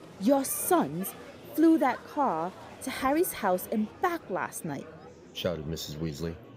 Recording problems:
murmuring crowd; noticeable; throughout; 20 dB below the speech

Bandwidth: 15.5 kHz